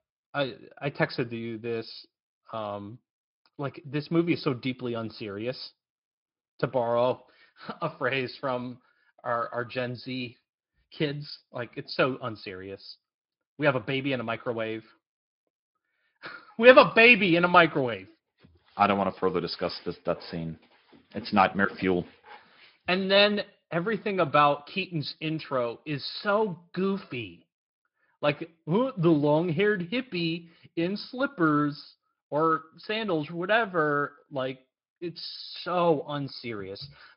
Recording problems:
high frequencies cut off; noticeable; nothing above 5 kHz
garbled, watery; slightly

